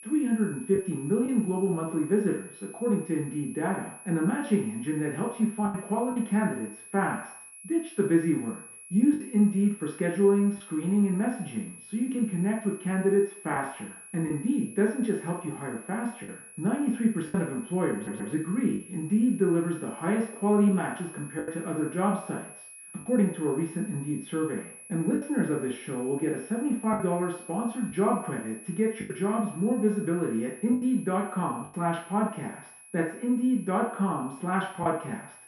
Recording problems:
off-mic speech; far
muffled; very; fading above 2.5 kHz
room echo; noticeable; dies away in 0.6 s
high-pitched whine; noticeable; throughout; 10.5 kHz, 15 dB below the speech
choppy; occasionally; 3% of the speech affected
audio stuttering; at 18 s

